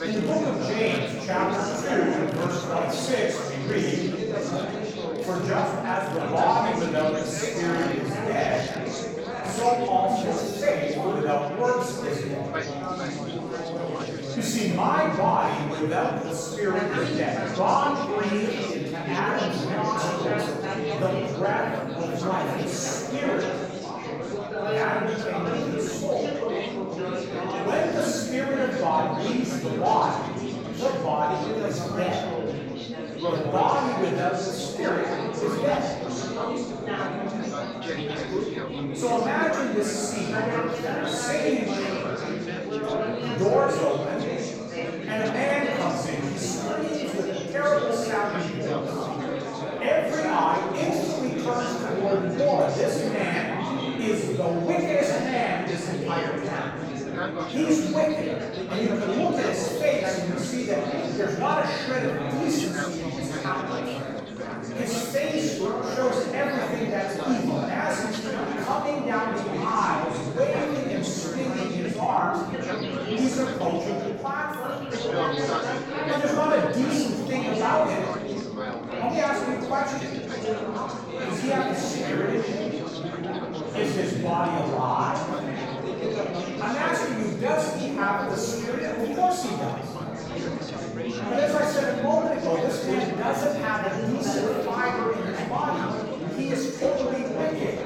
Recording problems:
off-mic speech; far
room echo; noticeable; dies away in 1.1 s
chatter from many people; loud; throughout; 4 dB below the speech
machinery noise; faint; throughout; 25 dB below the speech
background music; faint; throughout; 25 dB below the speech

